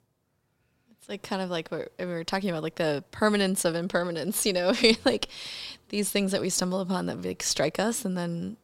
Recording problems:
none

